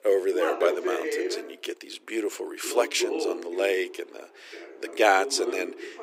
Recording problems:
thin; very; fading below 350 Hz
voice in the background; loud; throughout; 5 dB below the speech

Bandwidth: 15.5 kHz